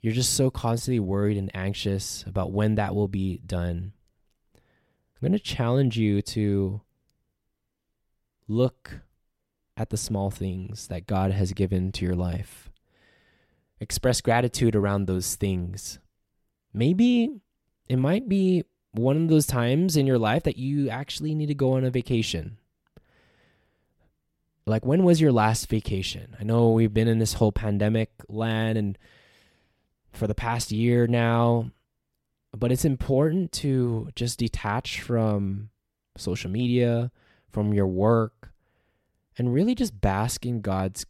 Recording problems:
none

